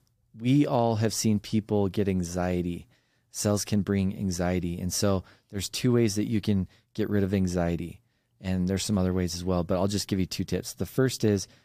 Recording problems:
none

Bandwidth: 15 kHz